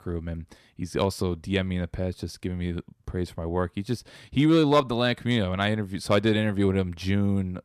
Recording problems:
none

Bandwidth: 14 kHz